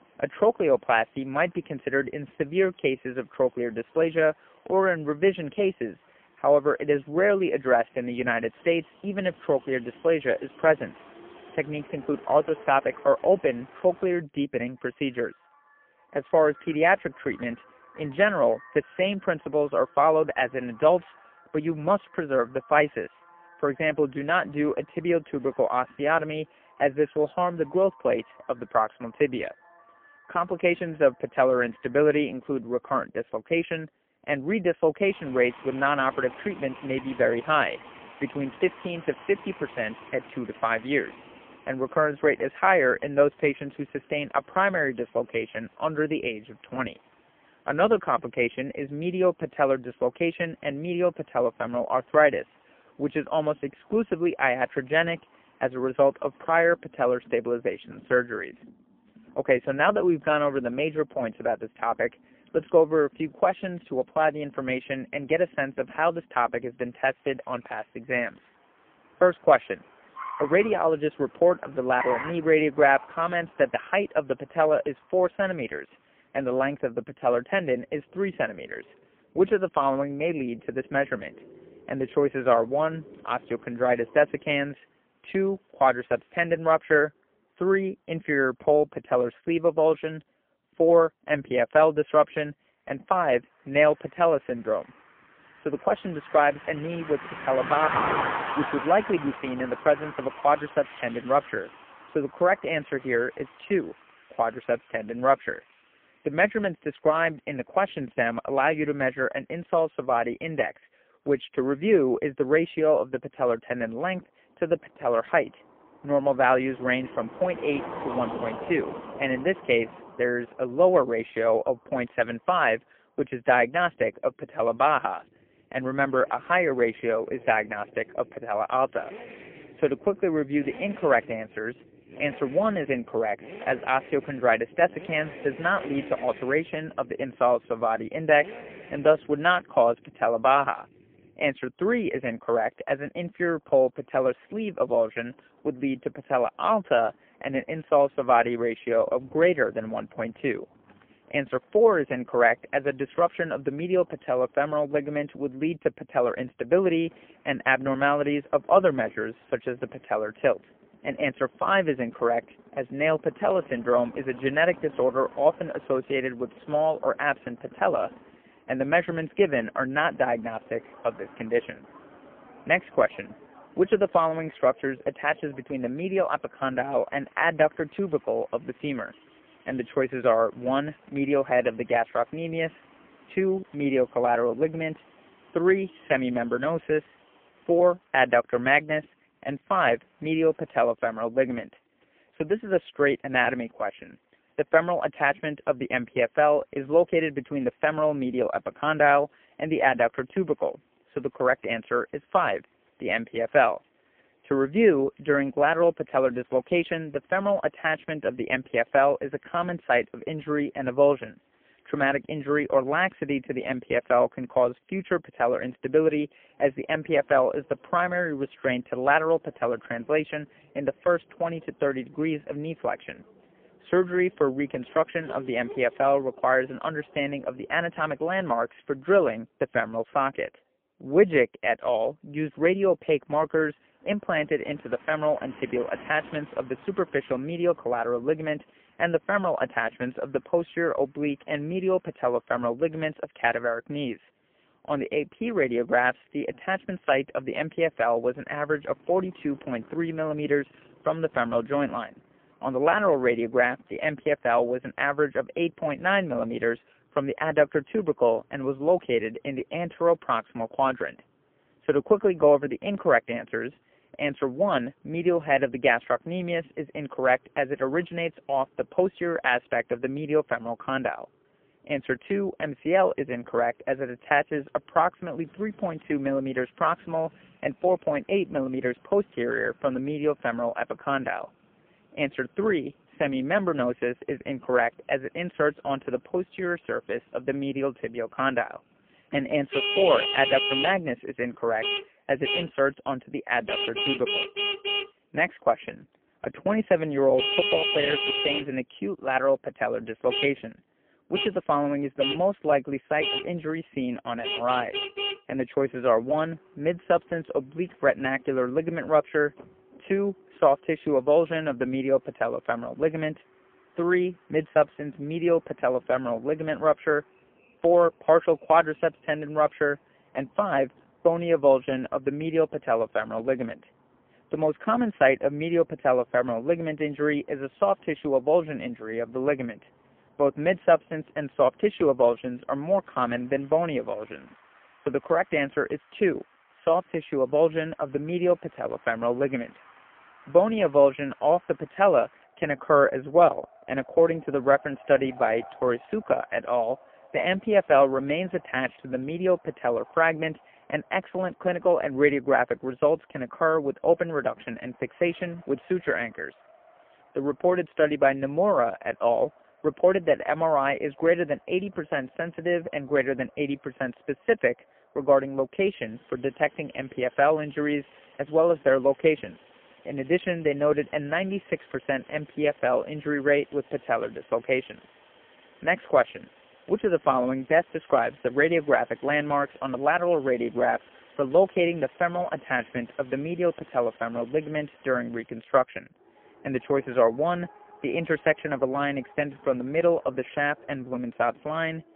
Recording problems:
phone-call audio; poor line; nothing above 3 kHz
traffic noise; loud; throughout; 10 dB below the speech

